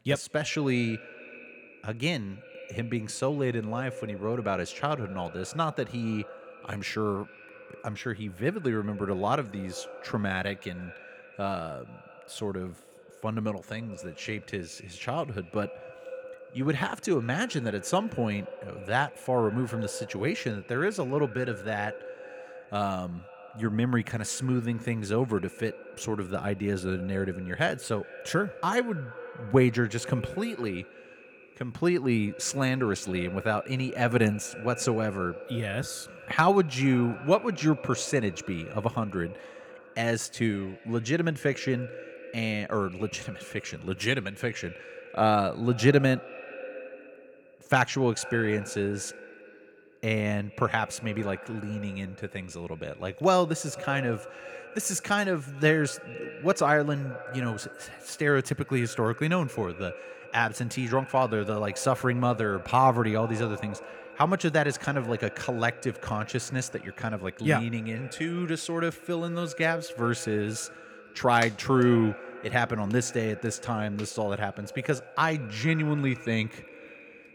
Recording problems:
echo of what is said; noticeable; throughout; 200 ms later, 15 dB below the speech

